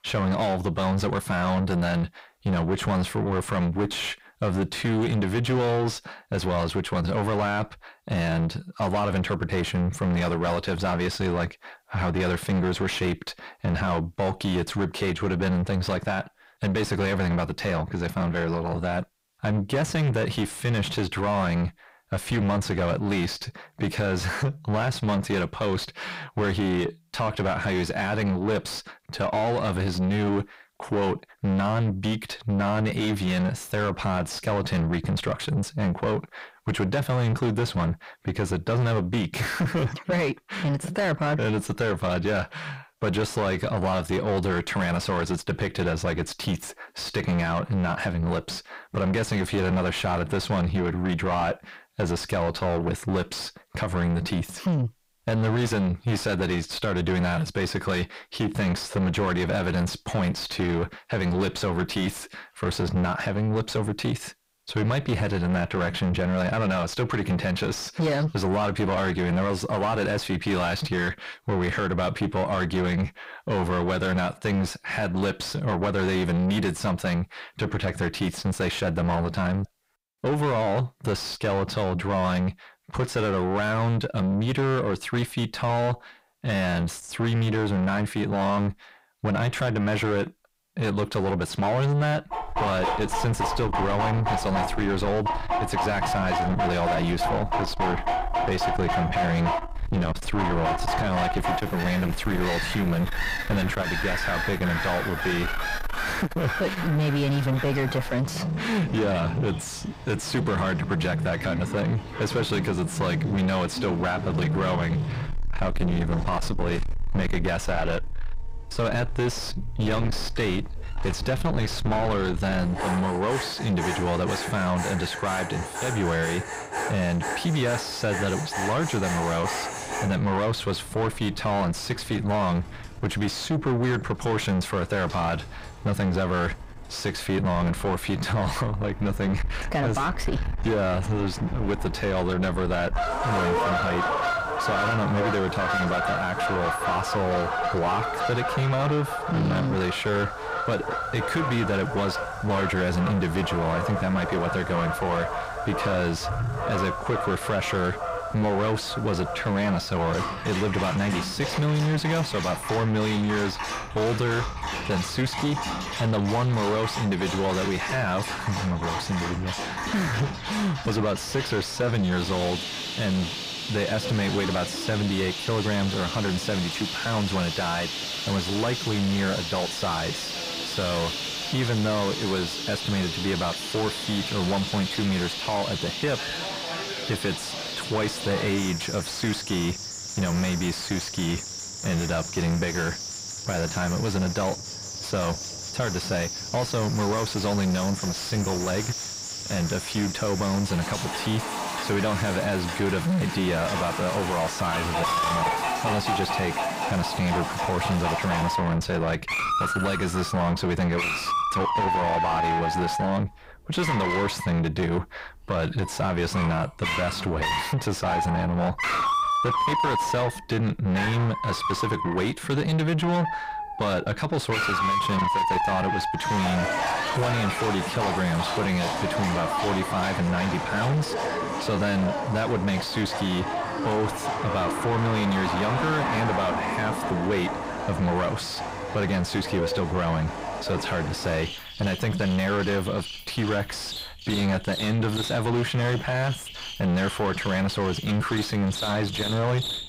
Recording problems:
distortion; heavy; 5 dB below the speech
animal sounds; loud; from 1:32 on; 3 dB below the speech

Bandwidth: 15.5 kHz